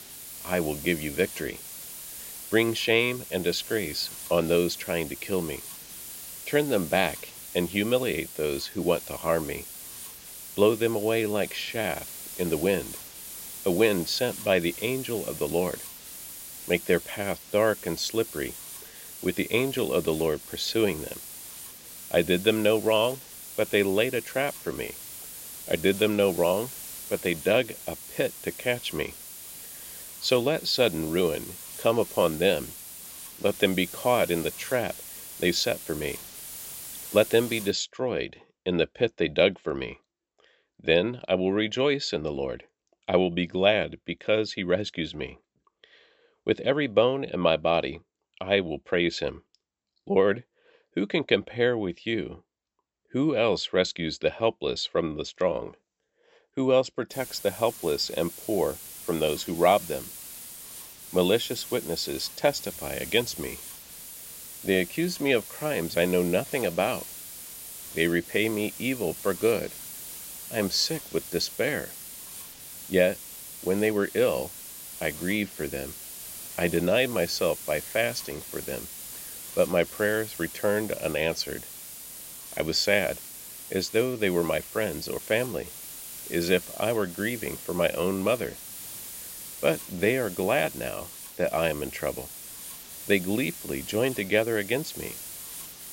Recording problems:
high frequencies cut off; noticeable; nothing above 7.5 kHz
hiss; noticeable; until 38 s and from 57 s on; 10 dB below the speech

